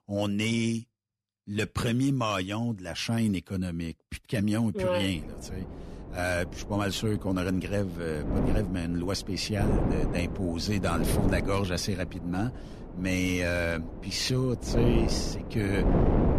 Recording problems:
wind noise on the microphone; heavy; from 5 s on; 6 dB below the speech

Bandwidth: 14 kHz